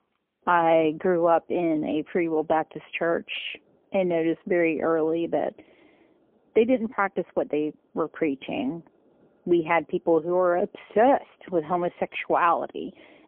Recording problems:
phone-call audio; poor line; nothing above 3.5 kHz

